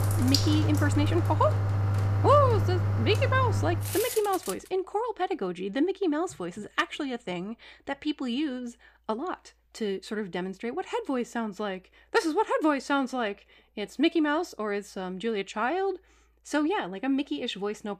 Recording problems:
household noises; very loud; until 4 s; 2 dB above the speech

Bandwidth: 15 kHz